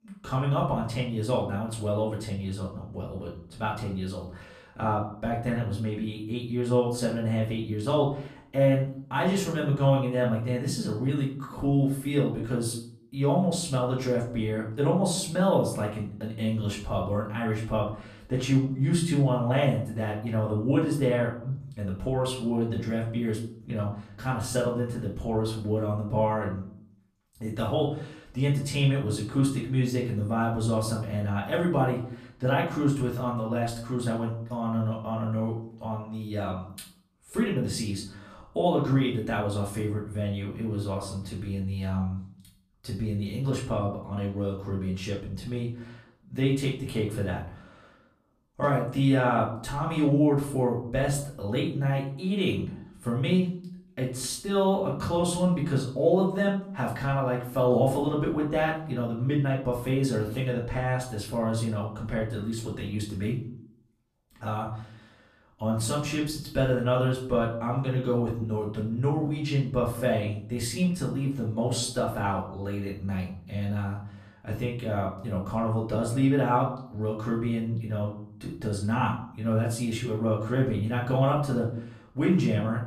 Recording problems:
off-mic speech; far
room echo; slight; dies away in 0.5 s

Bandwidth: 14.5 kHz